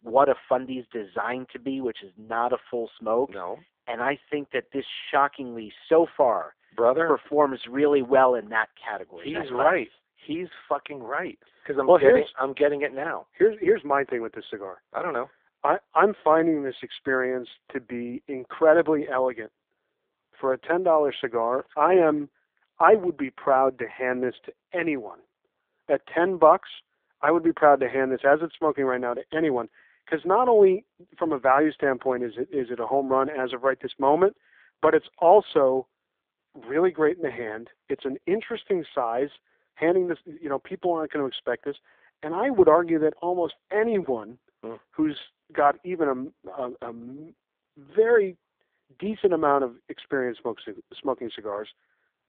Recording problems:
phone-call audio; poor line

